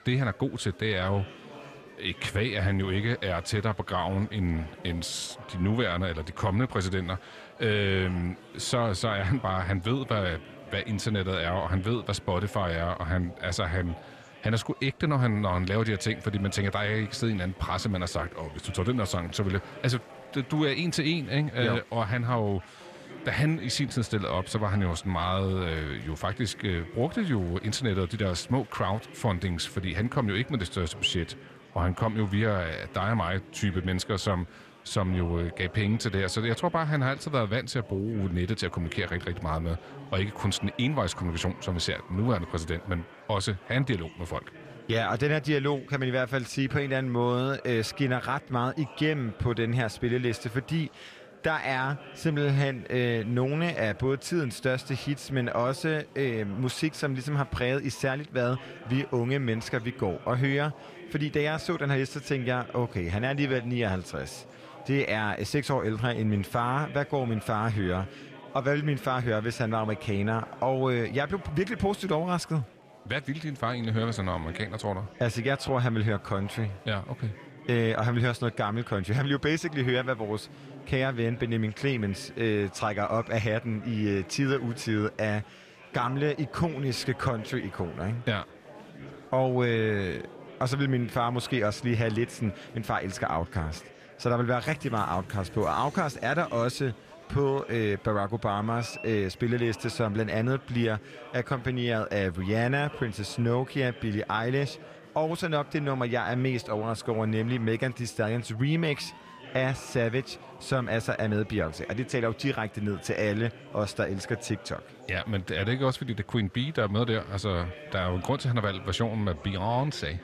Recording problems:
murmuring crowd; noticeable; throughout; 20 dB below the speech

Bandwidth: 14.5 kHz